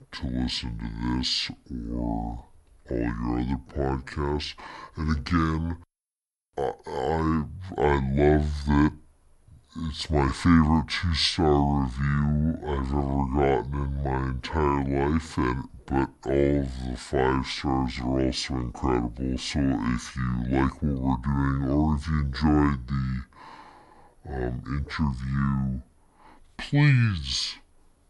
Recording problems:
wrong speed and pitch; too slow and too low; 0.6 times normal speed

